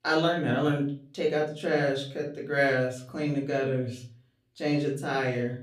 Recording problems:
off-mic speech; far
room echo; slight; dies away in 0.4 s

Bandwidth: 15.5 kHz